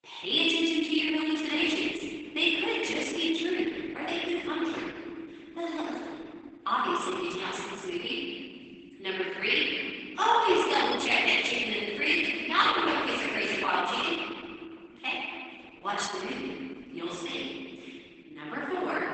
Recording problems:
room echo; strong; dies away in 2.3 s
off-mic speech; far
garbled, watery; badly; nothing above 8 kHz
thin; very slightly; fading below 250 Hz

